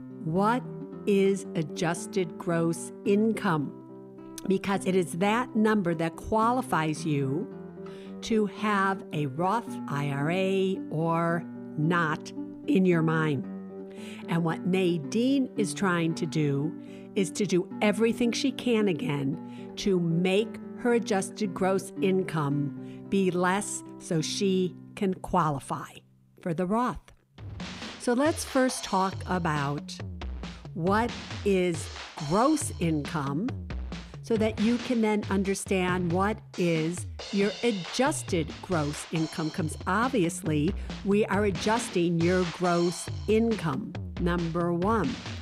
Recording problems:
background music; noticeable; throughout; 10 dB below the speech

